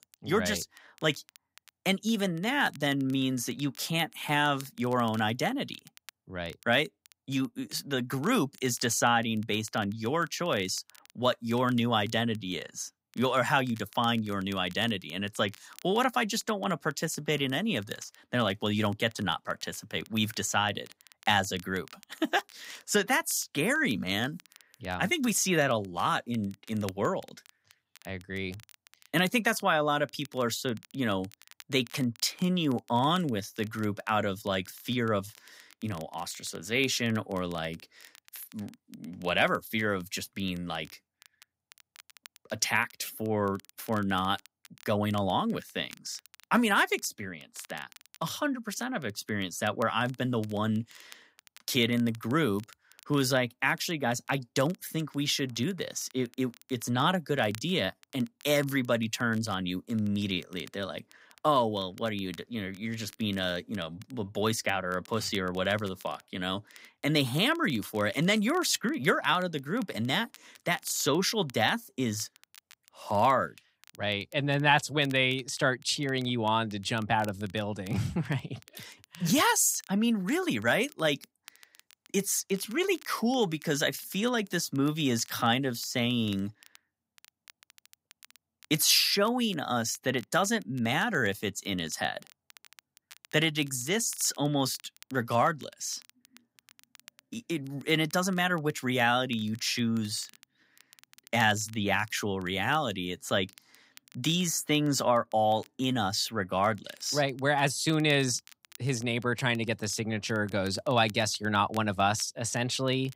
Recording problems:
crackle, like an old record; faint; 25 dB below the speech

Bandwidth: 15.5 kHz